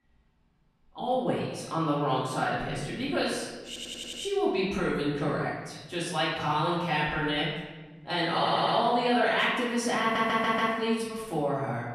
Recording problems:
off-mic speech; far
room echo; noticeable; dies away in 1.2 s
audio stuttering; at 3.5 s, at 8.5 s and at 10 s

